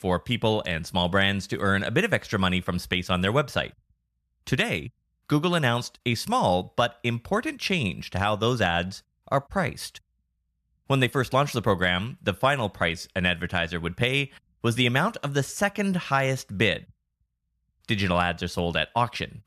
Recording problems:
none

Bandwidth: 14 kHz